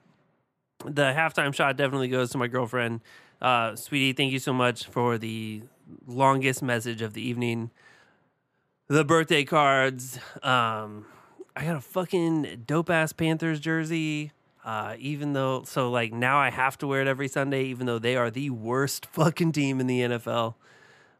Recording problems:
none

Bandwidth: 14.5 kHz